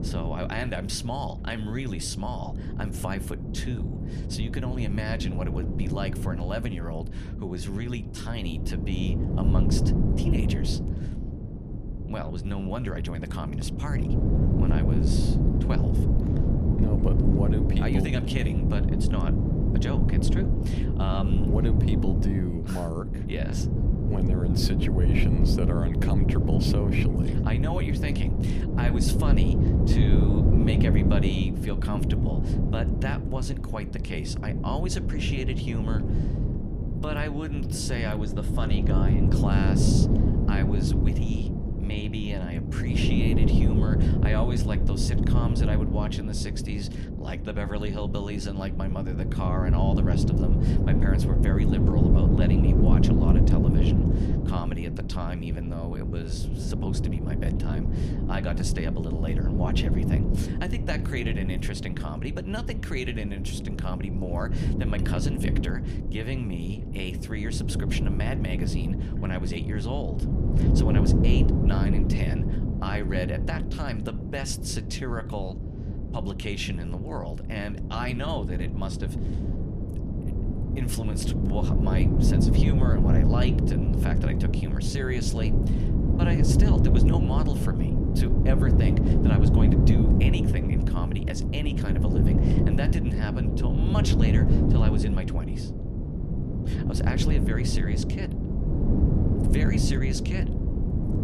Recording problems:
wind noise on the microphone; heavy; as loud as the speech

